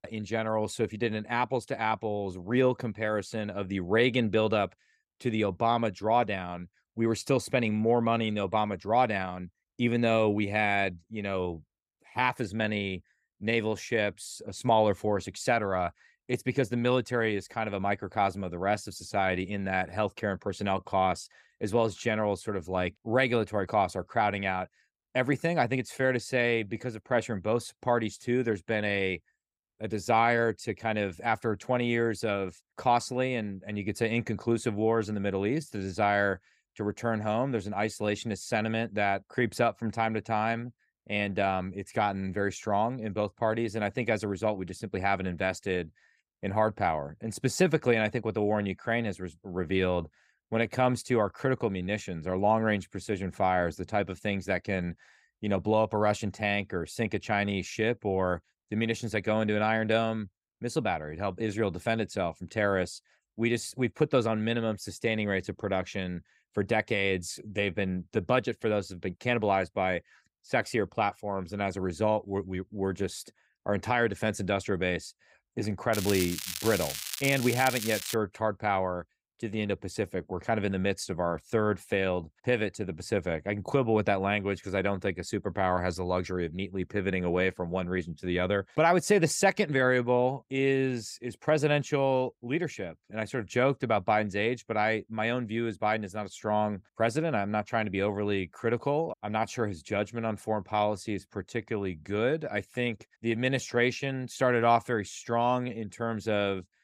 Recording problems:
crackling; loud; from 1:16 to 1:18; 5 dB below the speech

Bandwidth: 15.5 kHz